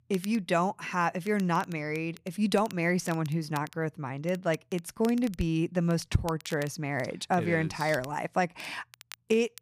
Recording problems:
crackle, like an old record; faint; 20 dB below the speech

